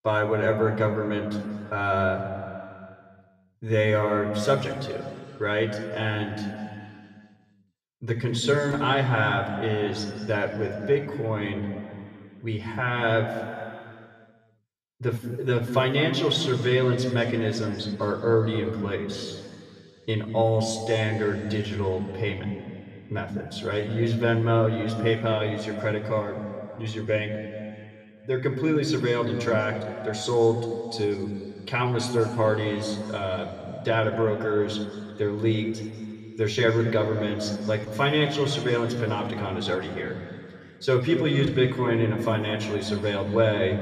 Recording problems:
room echo; noticeable; dies away in 2.4 s
off-mic speech; somewhat distant

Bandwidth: 14.5 kHz